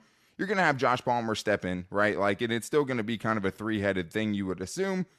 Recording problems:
none

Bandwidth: 13.5 kHz